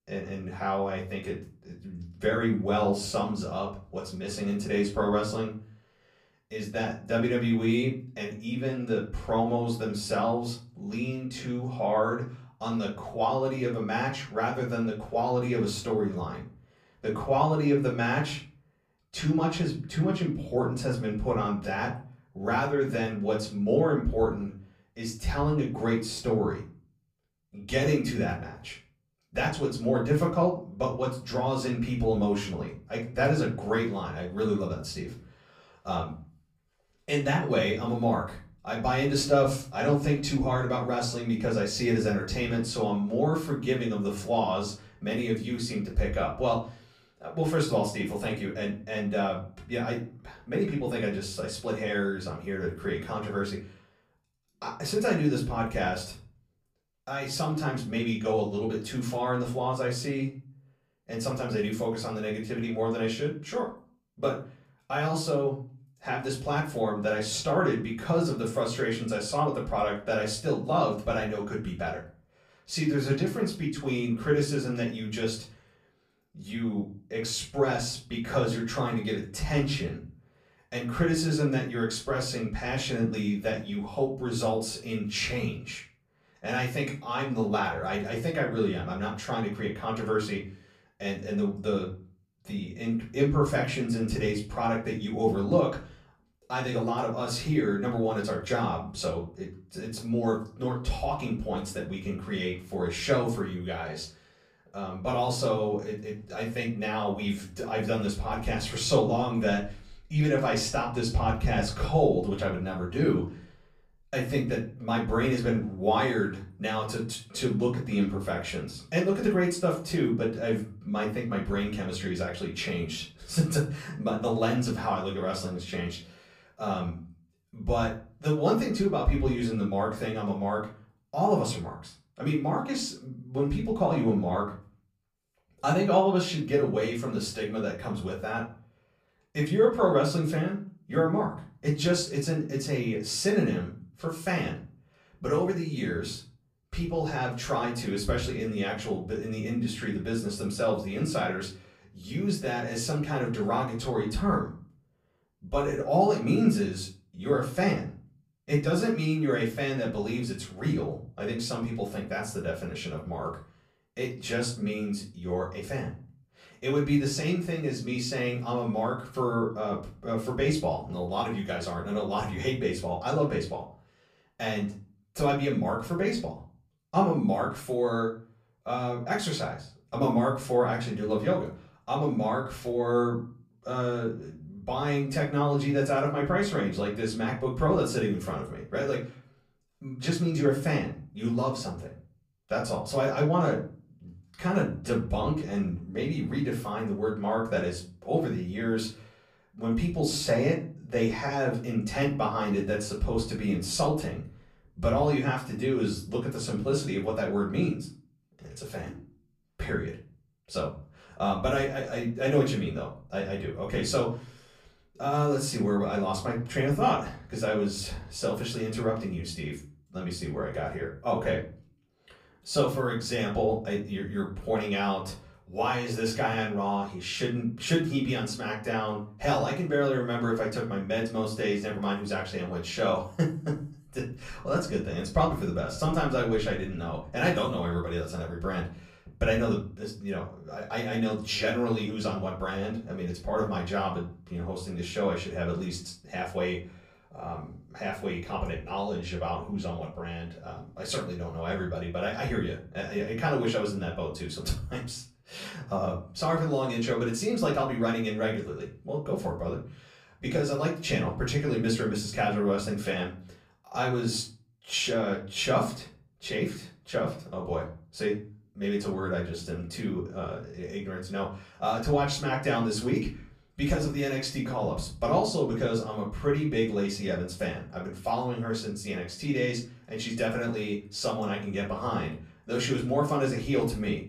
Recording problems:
off-mic speech; far
room echo; slight; dies away in 0.4 s

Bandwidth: 15 kHz